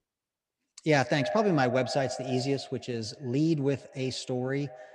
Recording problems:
echo of what is said; strong; throughout; 130 ms later, 8 dB below the speech

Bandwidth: 15.5 kHz